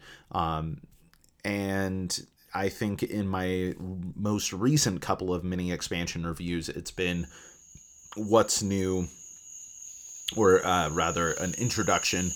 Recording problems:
animal sounds; noticeable; throughout; 10 dB below the speech

